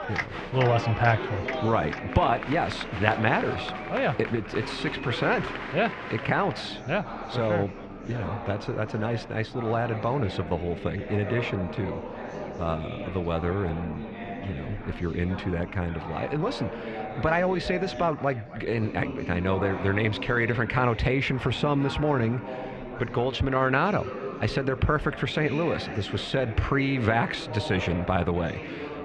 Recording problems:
muffled; slightly; fading above 2.5 kHz
murmuring crowd; loud; throughout; 8 dB below the speech

